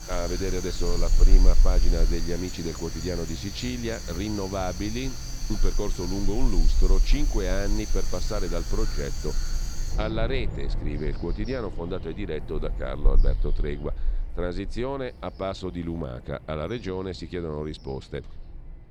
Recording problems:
animal sounds; very loud; throughout; 2 dB above the speech

